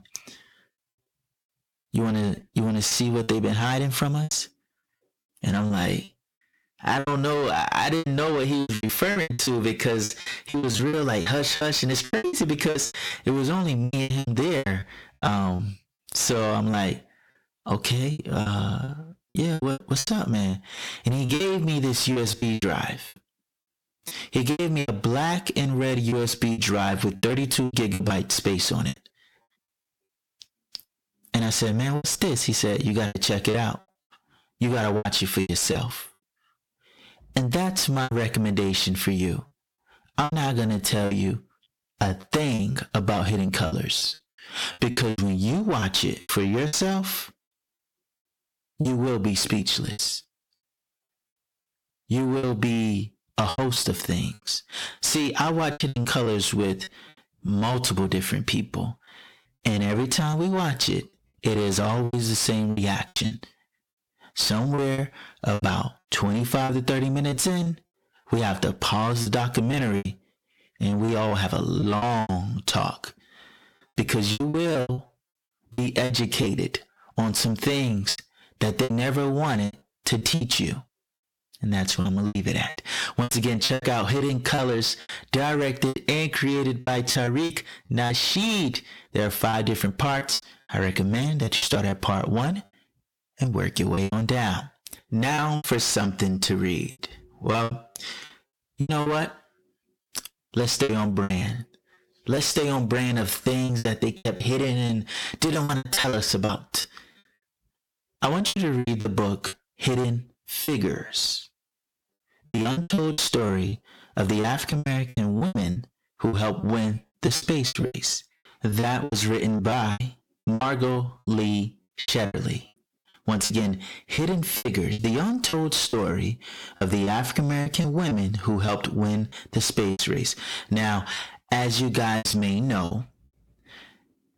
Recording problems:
distortion; heavy; 7 dB below the speech
squashed, flat; somewhat
choppy; very; 13% of the speech affected

